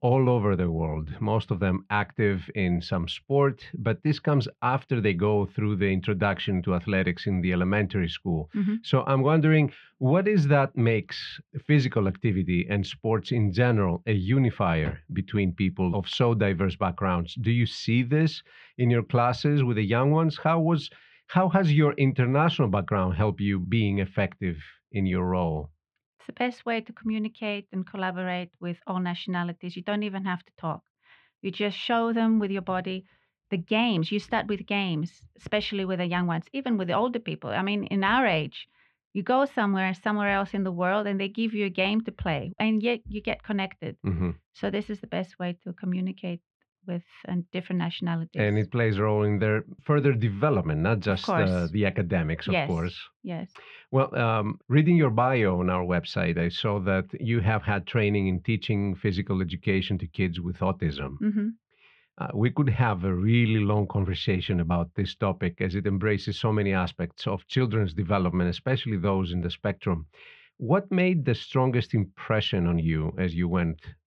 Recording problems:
muffled; very; fading above 3 kHz

